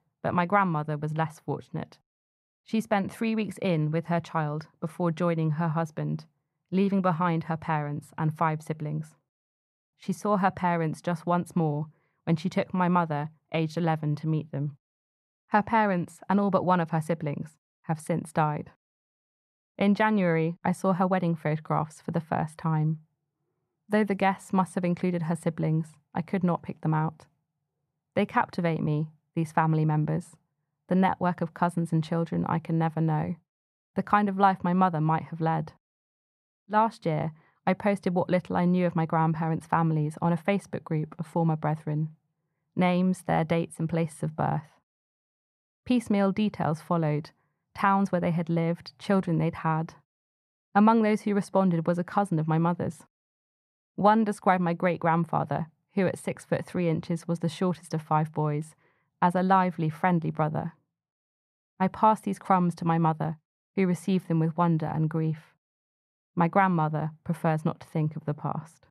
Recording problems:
muffled; very; fading above 2.5 kHz

